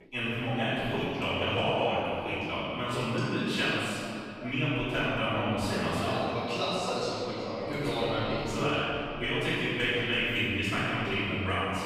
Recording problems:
room echo; strong; dies away in 2.5 s
off-mic speech; far
voice in the background; noticeable; throughout; 20 dB below the speech

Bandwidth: 15.5 kHz